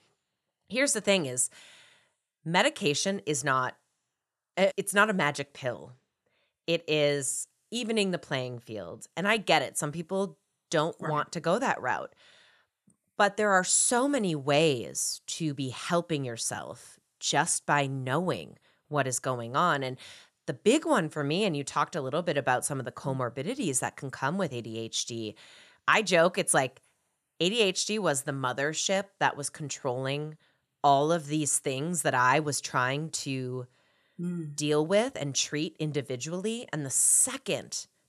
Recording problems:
none

